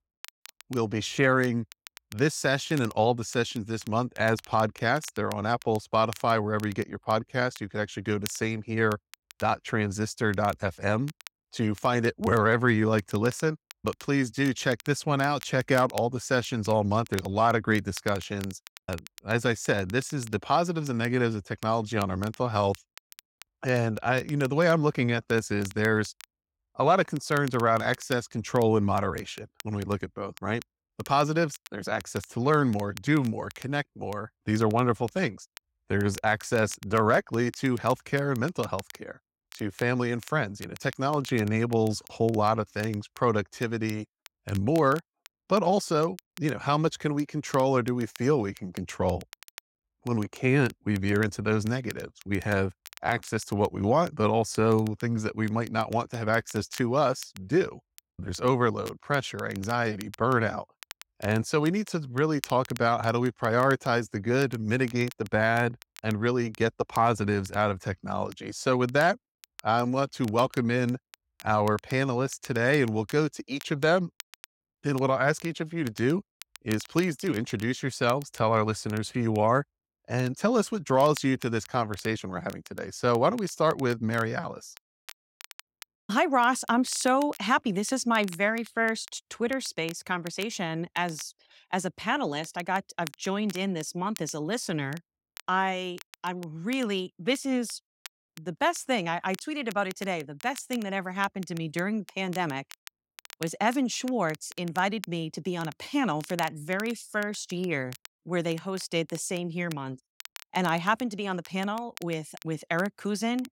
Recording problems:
crackle, like an old record; faint; 20 dB below the speech

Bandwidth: 16 kHz